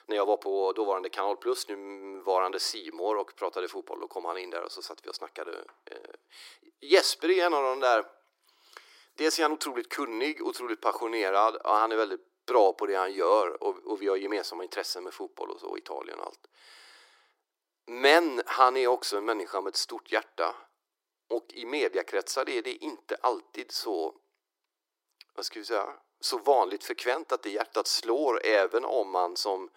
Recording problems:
thin; very; fading below 300 Hz

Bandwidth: 16 kHz